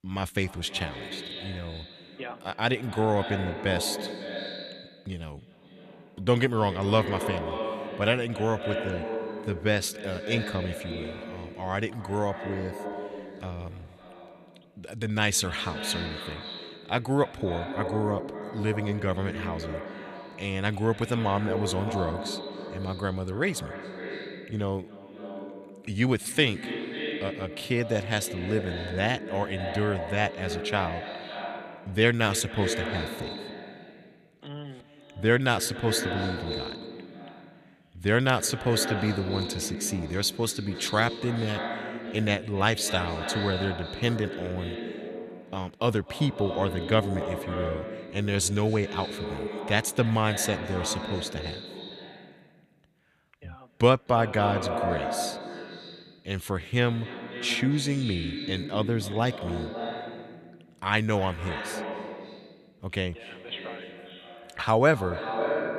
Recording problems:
echo of what is said; strong; throughout; 260 ms later, 7 dB below the speech

